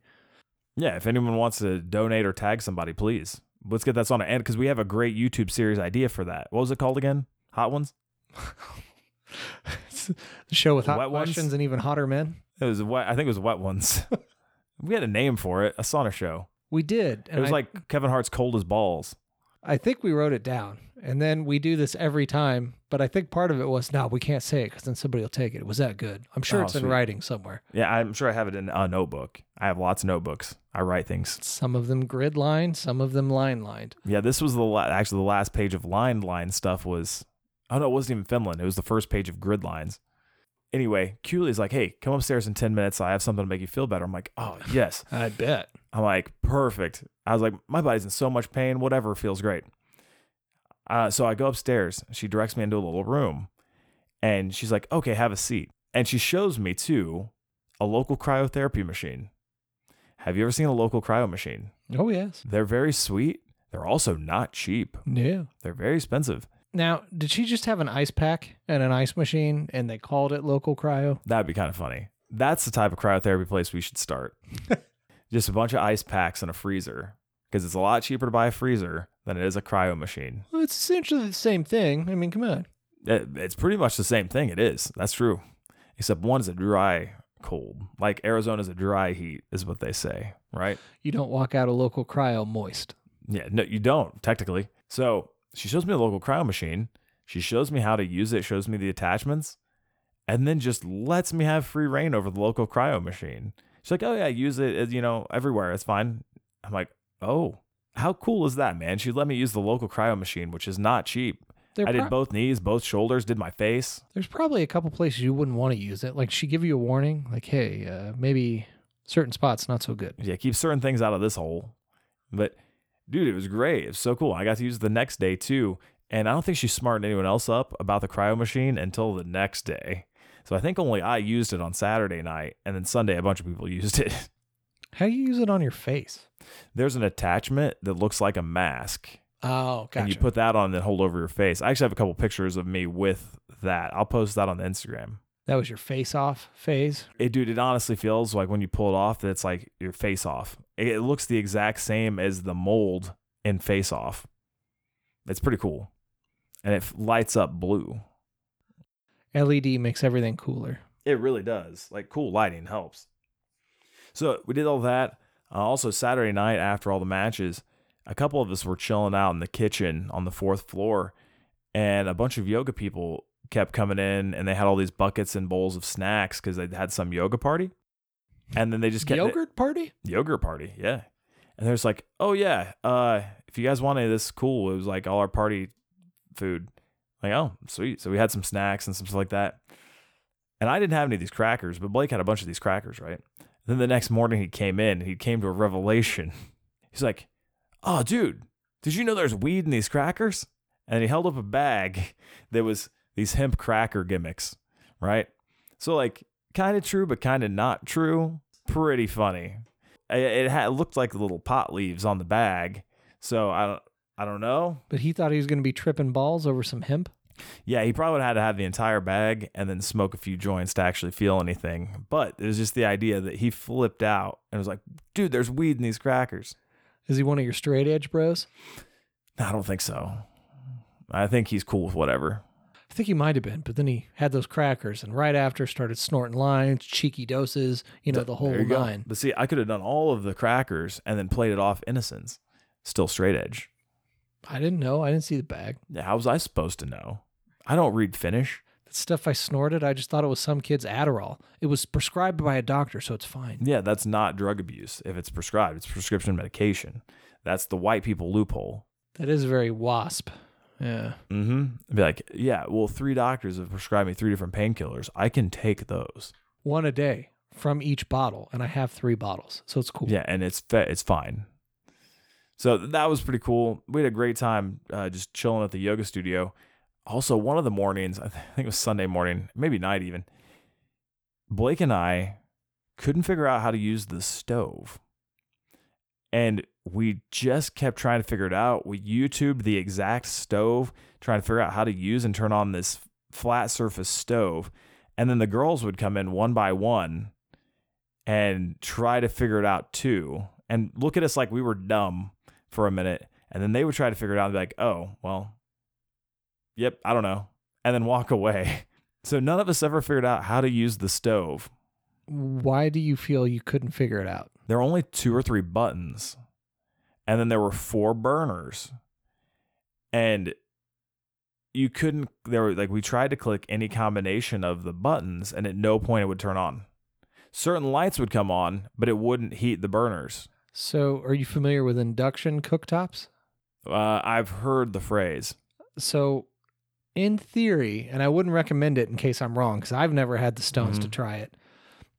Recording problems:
none

